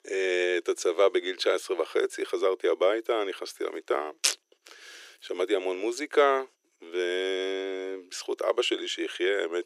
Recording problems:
thin; very; fading below 350 Hz

